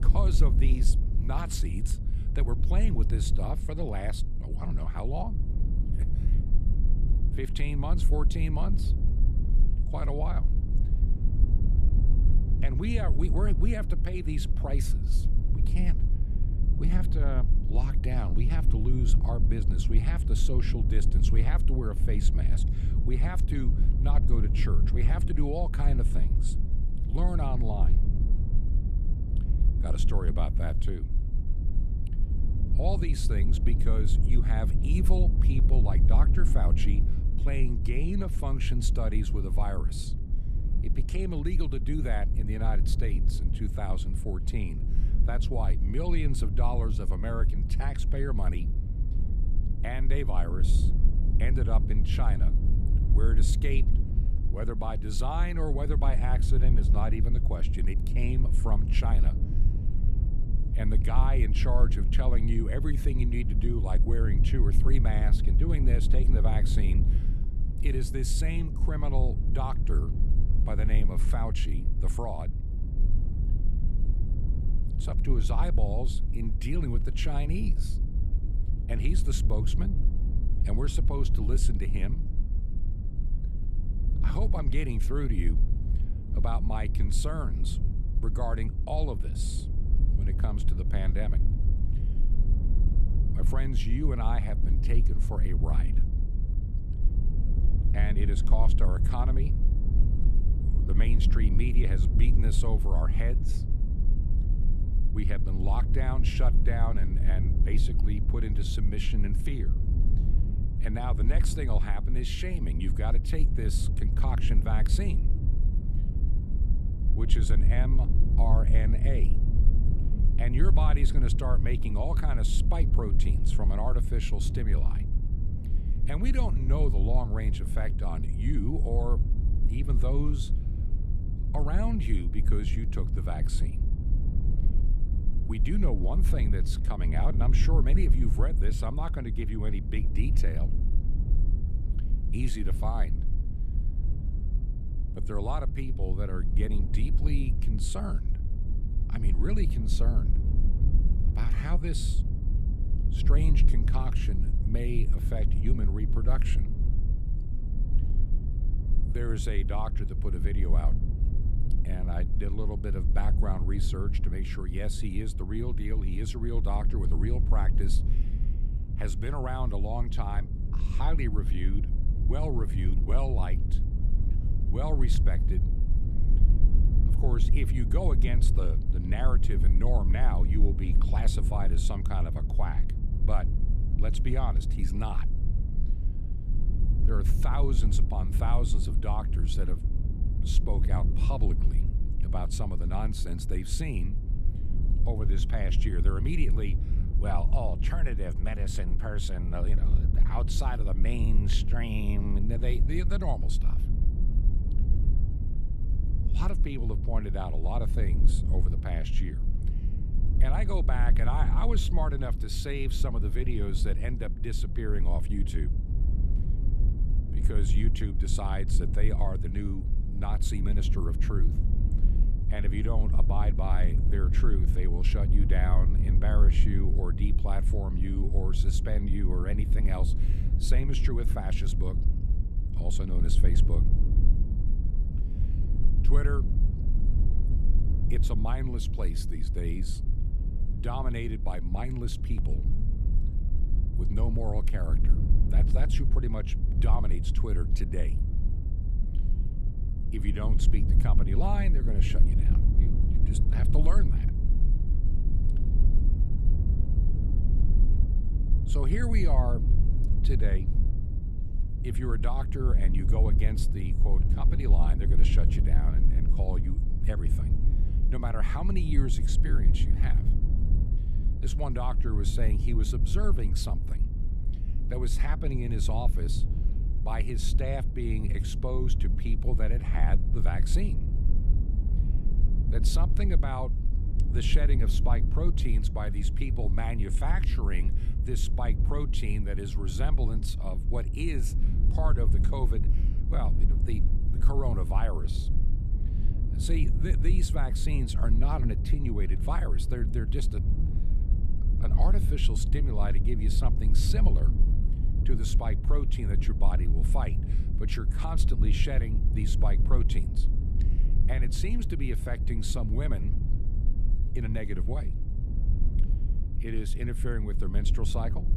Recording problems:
low rumble; loud; throughout; 7 dB below the speech

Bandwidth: 14 kHz